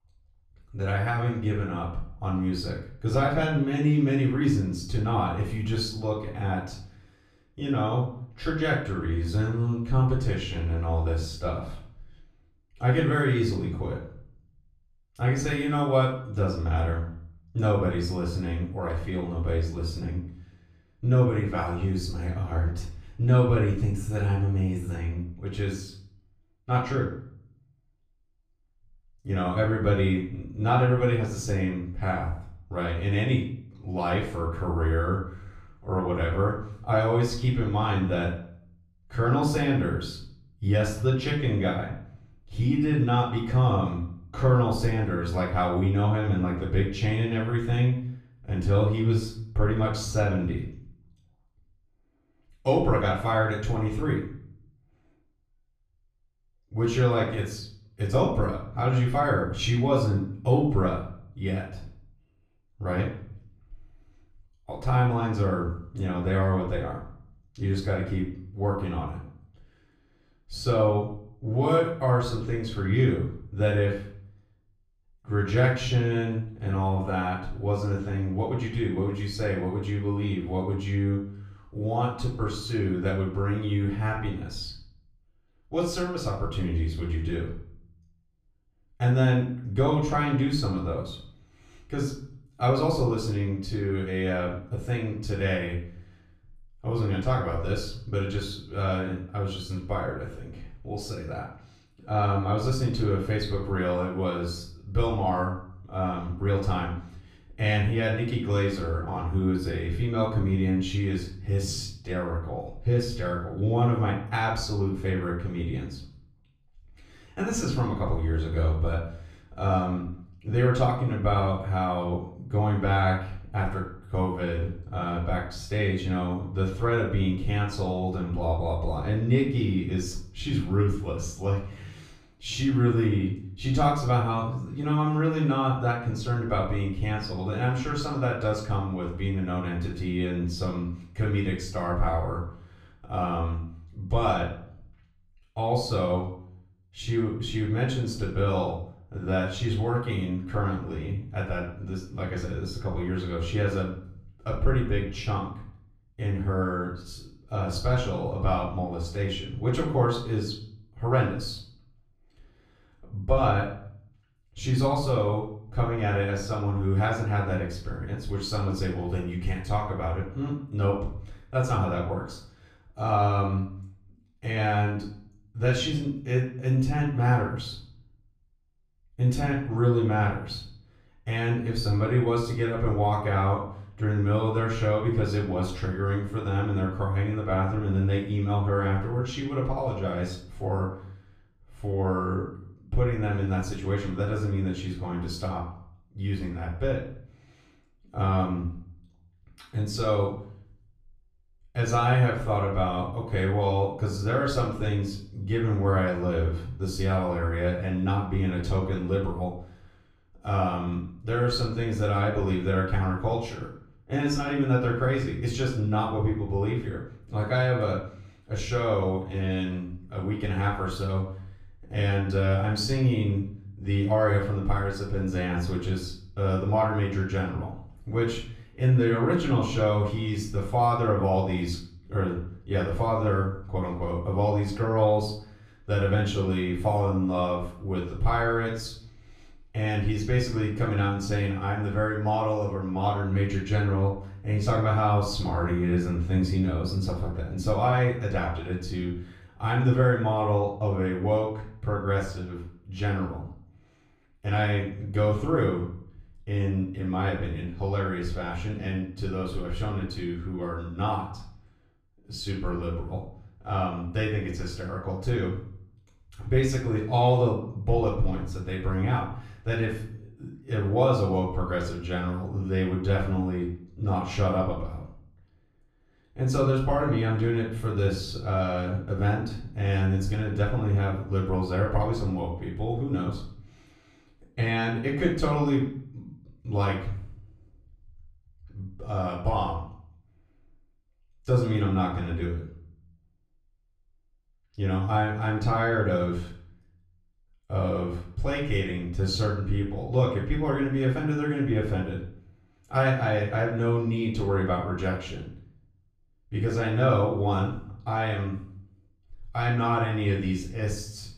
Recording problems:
off-mic speech; far
room echo; noticeable; dies away in 0.5 s

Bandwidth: 14.5 kHz